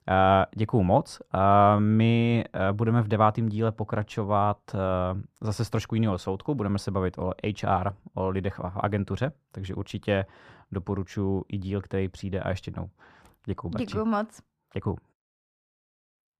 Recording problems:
muffled; slightly; fading above 3 kHz

